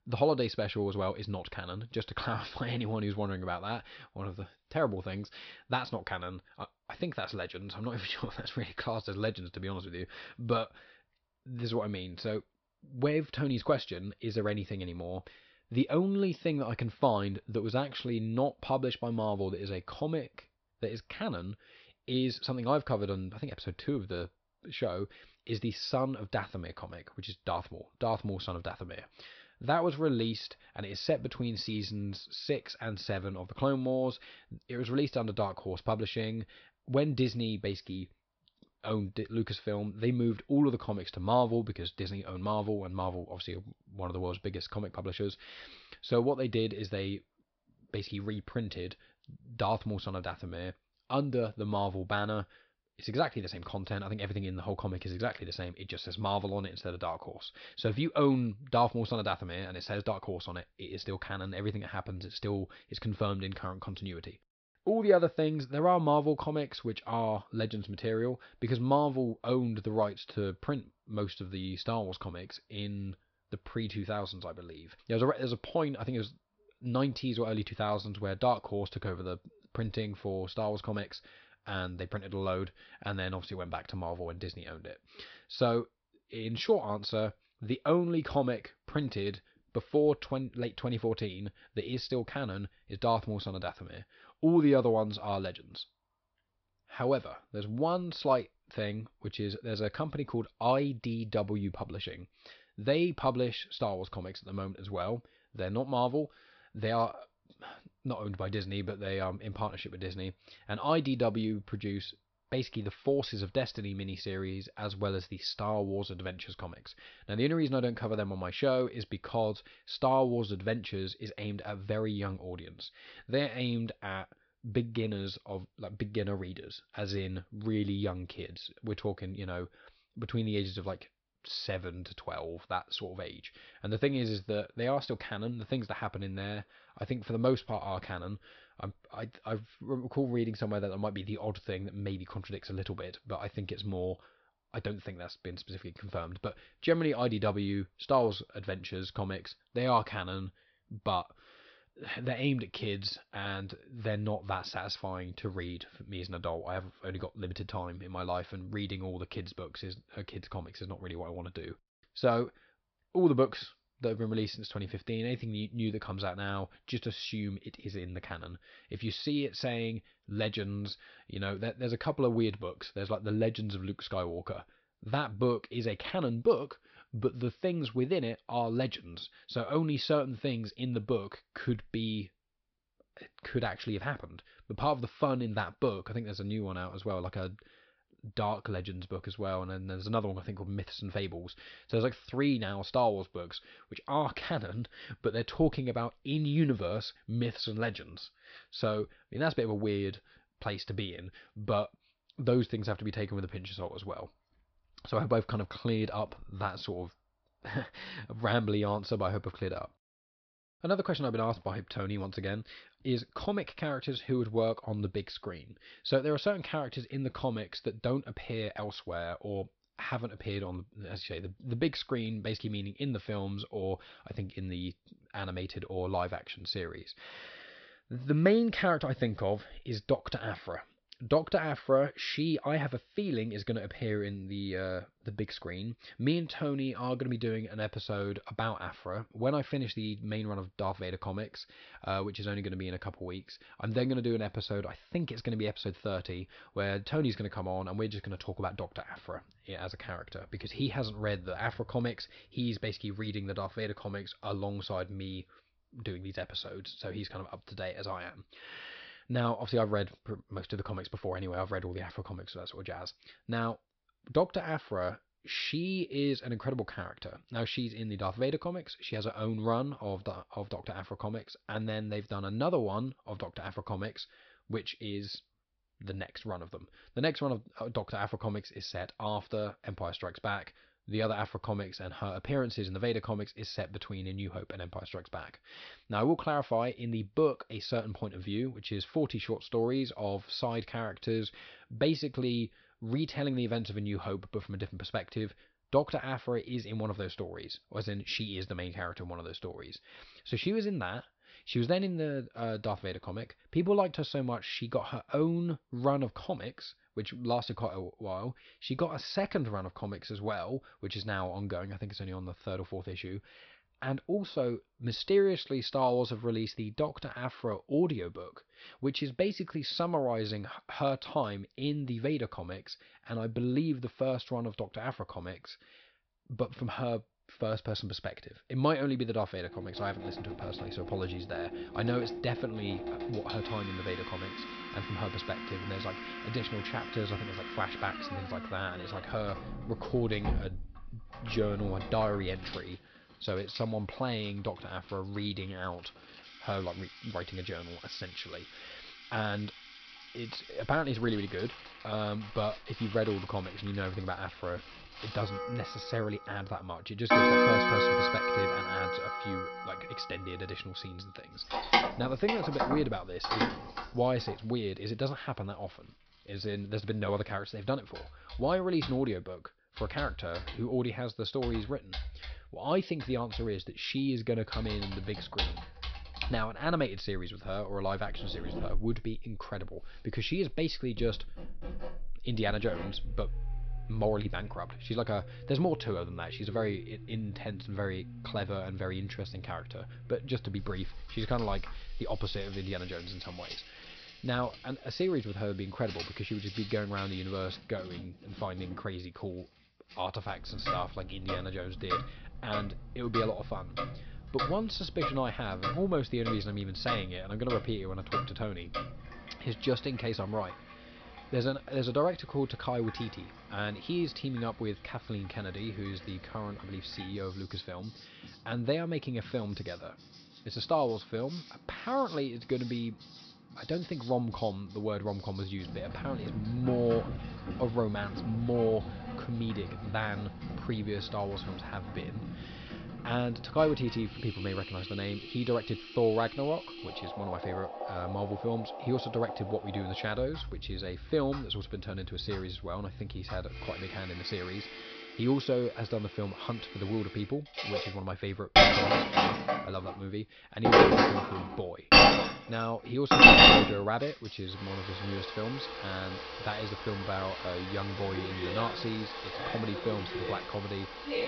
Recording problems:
high frequencies cut off; noticeable; nothing above 5.5 kHz
household noises; very loud; from 5:30 on; 5 dB above the speech

